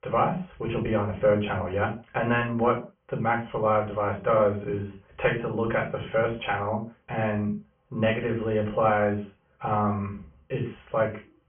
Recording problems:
off-mic speech; far
high frequencies cut off; severe; nothing above 3 kHz
room echo; slight; dies away in 0.3 s

